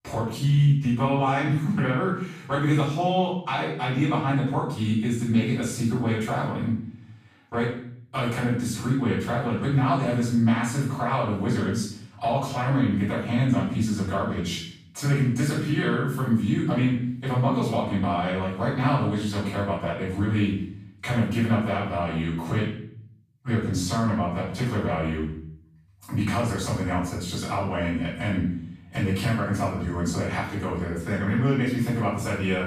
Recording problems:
off-mic speech; far
room echo; noticeable; dies away in 0.6 s

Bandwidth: 15 kHz